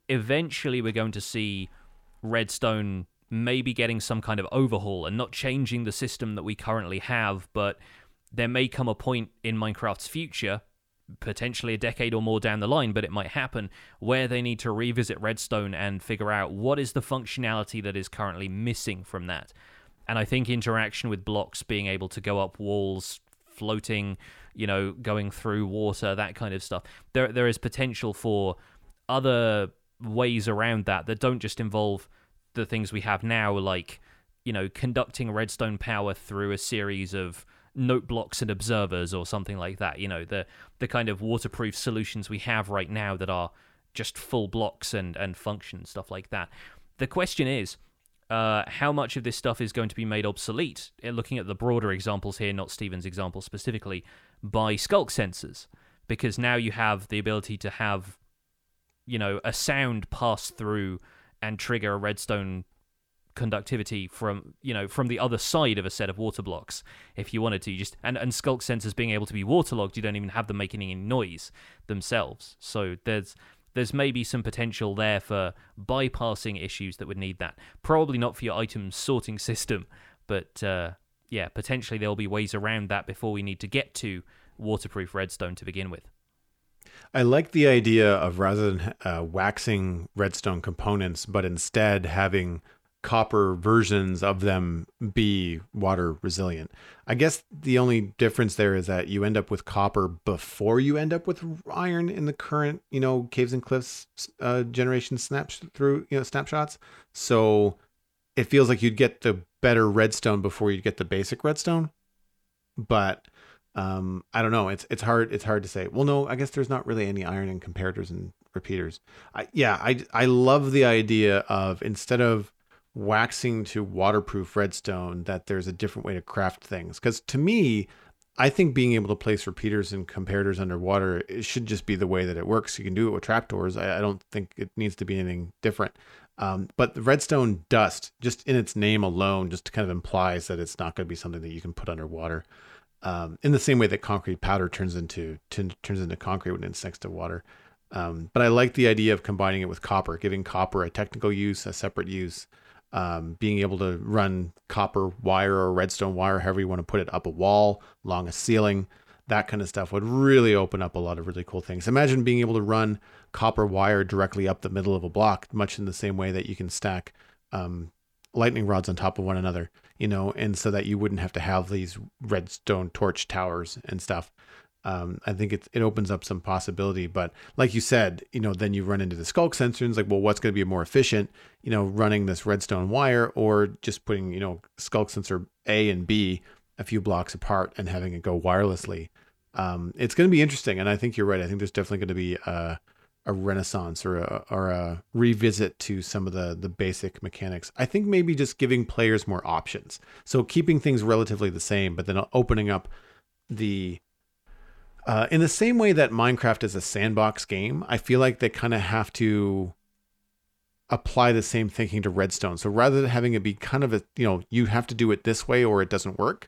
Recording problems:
none

